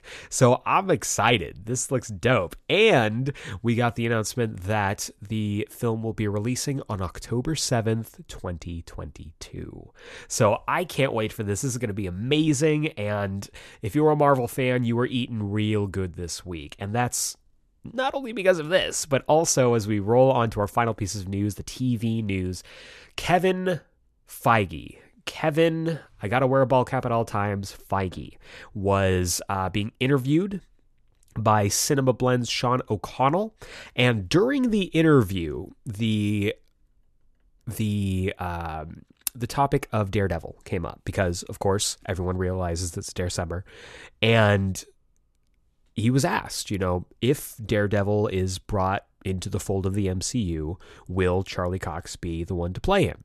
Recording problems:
none

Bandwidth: 13.5 kHz